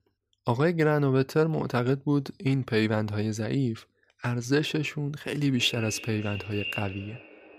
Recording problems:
echo of what is said; strong; from 5.5 s on; 290 ms later, 10 dB below the speech

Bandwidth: 15 kHz